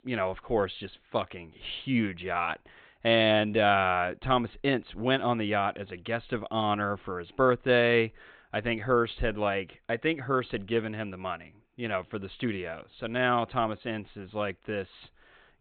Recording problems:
high frequencies cut off; severe; nothing above 4 kHz

